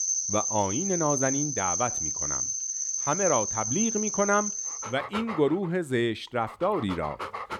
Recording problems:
animal sounds; very loud; throughout; as loud as the speech

